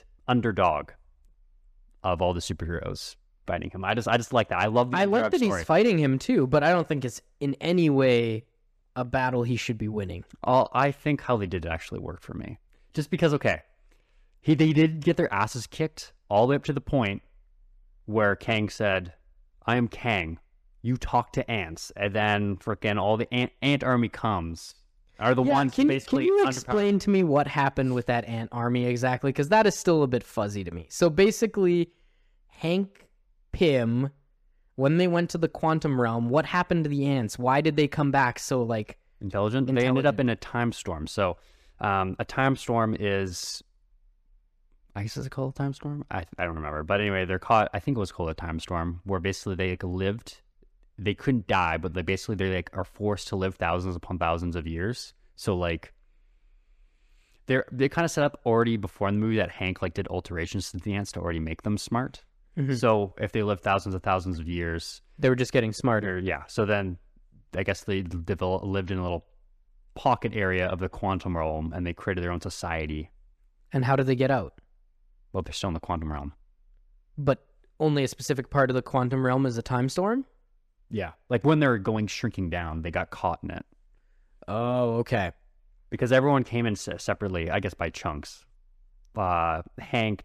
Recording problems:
none

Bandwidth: 14.5 kHz